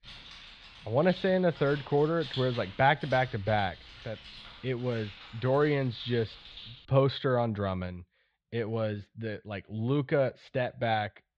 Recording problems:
muffled; slightly; fading above 3.5 kHz
jangling keys; noticeable; until 7 s; peak 9 dB below the speech

